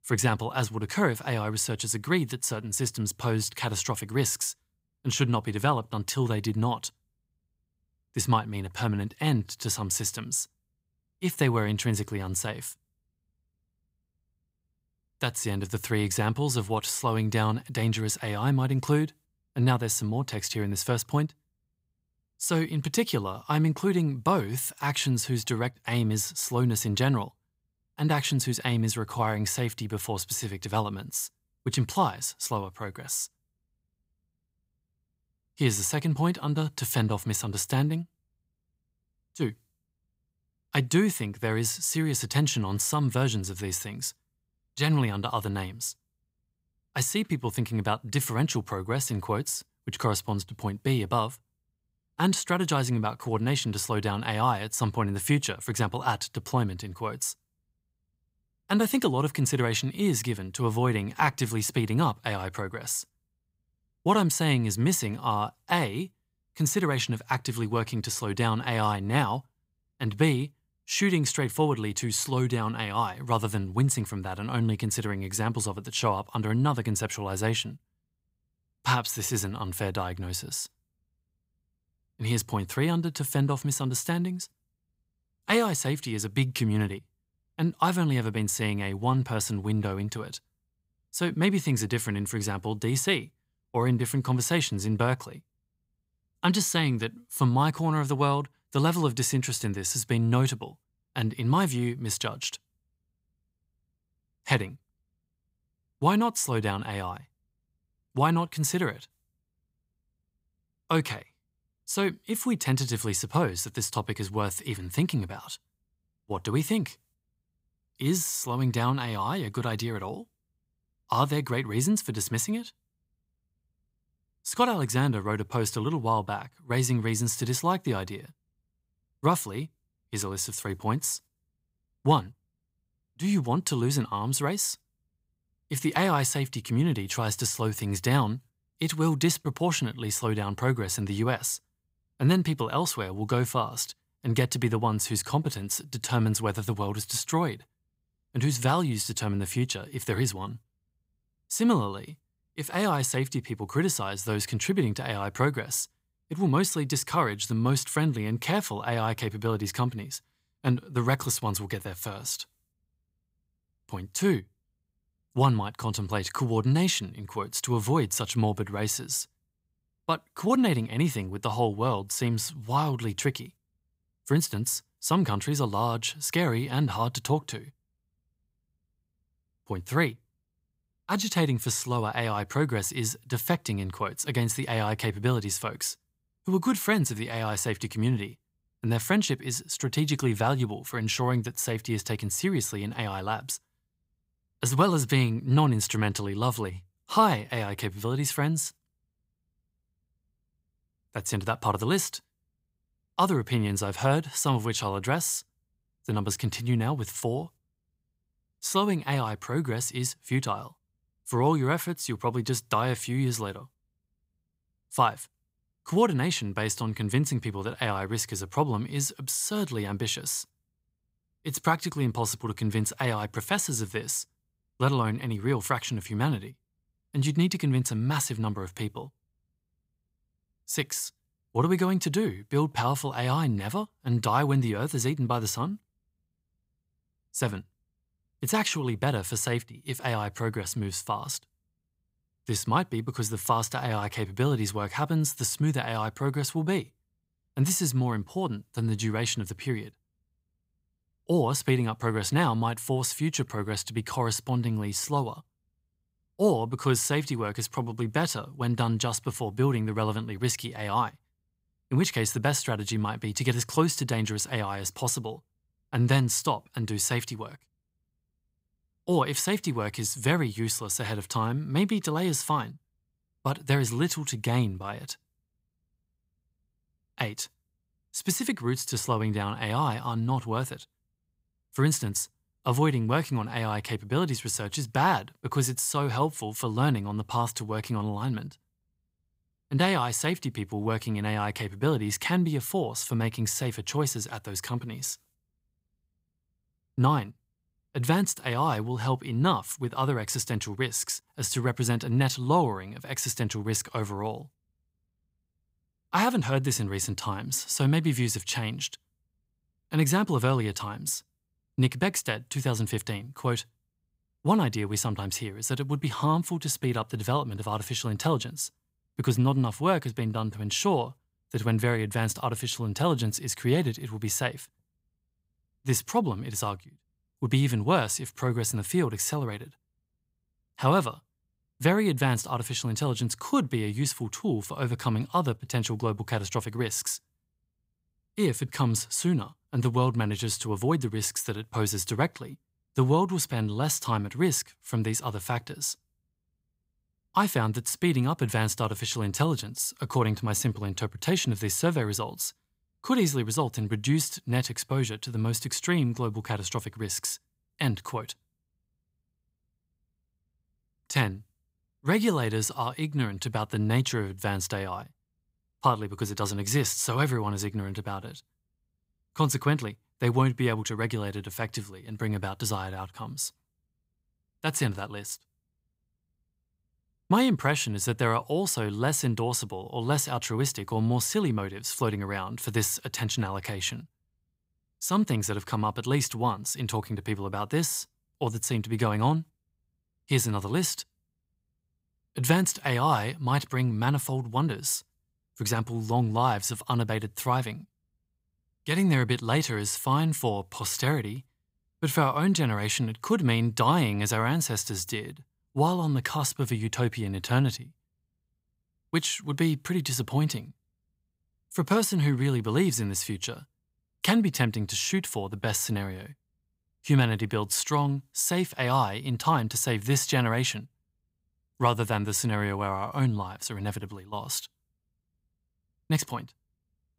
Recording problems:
none

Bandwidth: 15.5 kHz